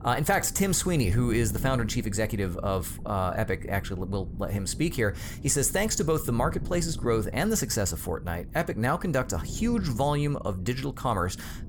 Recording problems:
wind noise on the microphone; occasional gusts; 20 dB below the speech

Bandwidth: 18 kHz